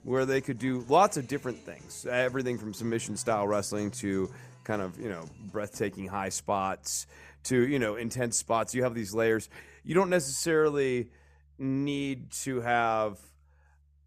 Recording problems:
background music; faint; throughout; 25 dB below the speech

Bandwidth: 14.5 kHz